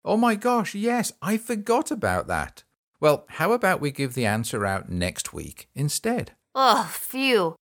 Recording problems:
none

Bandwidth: 17.5 kHz